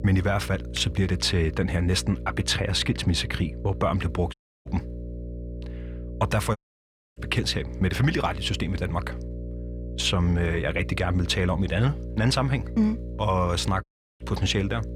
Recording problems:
electrical hum; noticeable; throughout; 60 Hz, 15 dB below the speech
audio cutting out; at 4.5 s, at 6.5 s for 0.5 s and at 14 s

